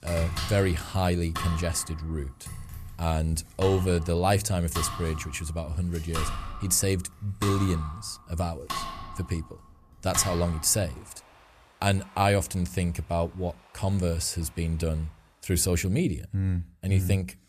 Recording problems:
household noises; loud; throughout; 10 dB below the speech

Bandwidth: 14.5 kHz